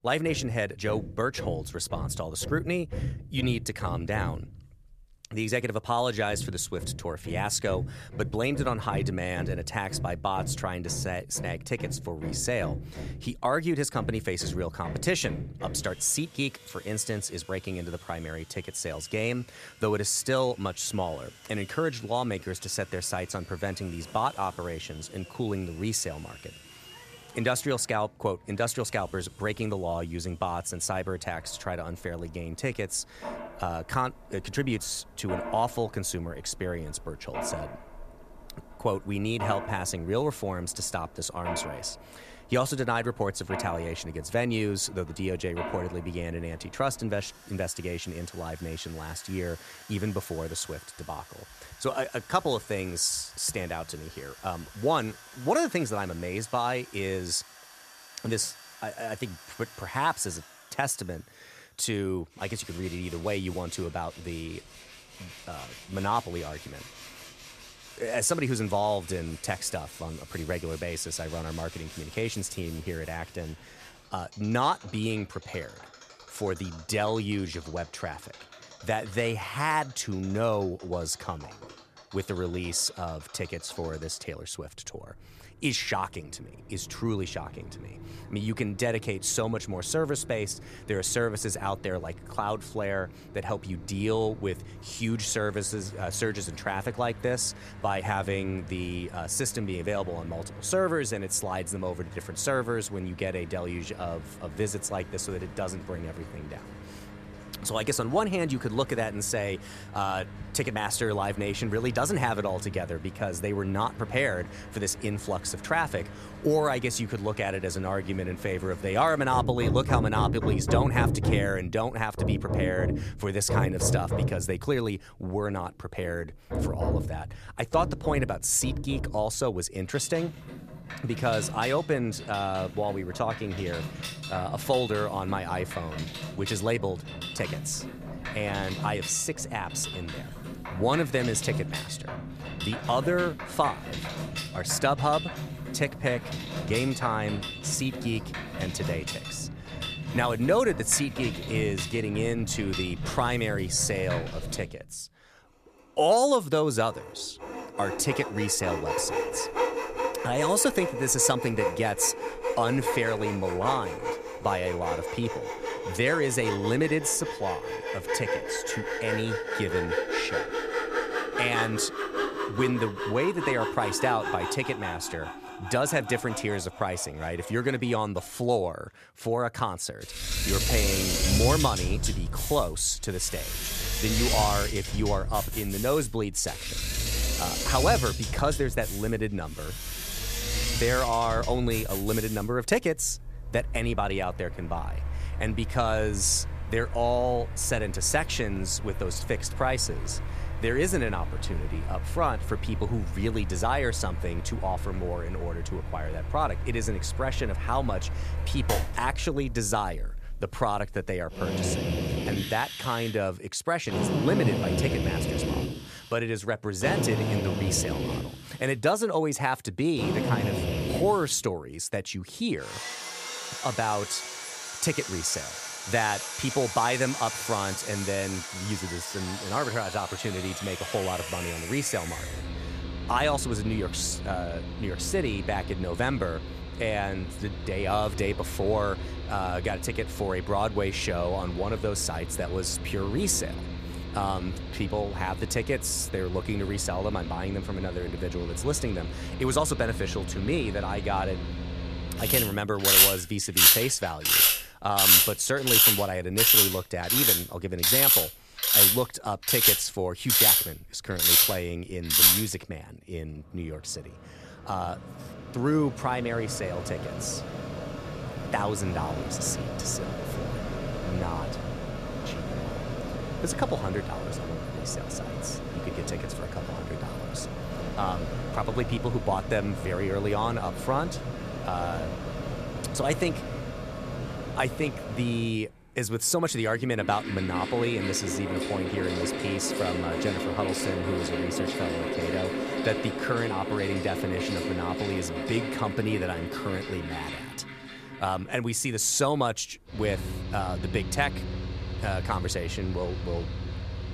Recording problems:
machinery noise; very loud; throughout; as loud as the speech

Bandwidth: 14.5 kHz